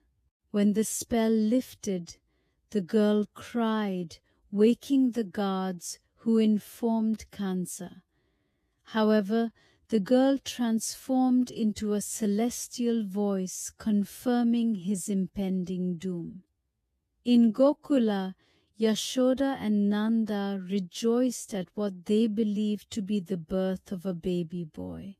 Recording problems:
wrong speed, natural pitch; too slow; 0.7 times normal speed

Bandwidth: 14.5 kHz